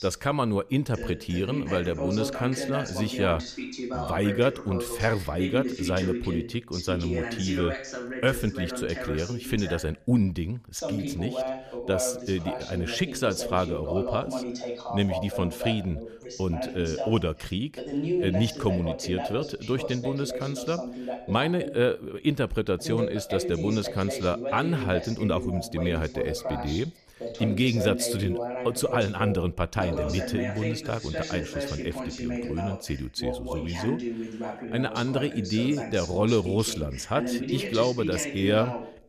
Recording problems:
voice in the background; loud; throughout; 5 dB below the speech

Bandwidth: 14.5 kHz